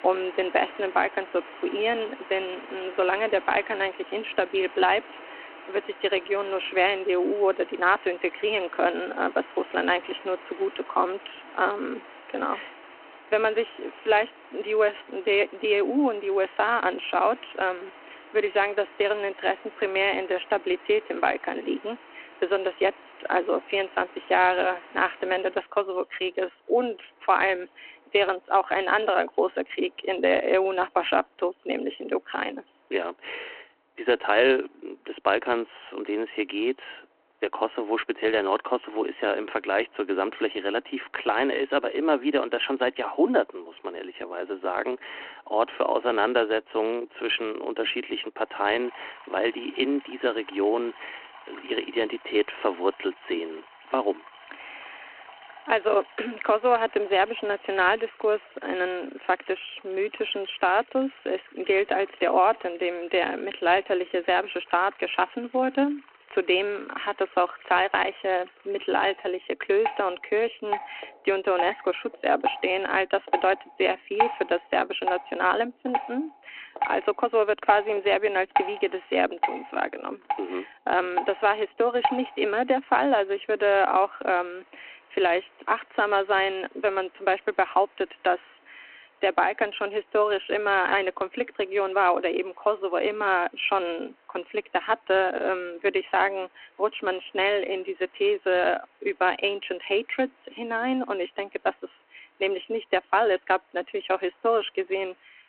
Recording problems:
phone-call audio
rain or running water; noticeable; throughout; 15 dB below the speech

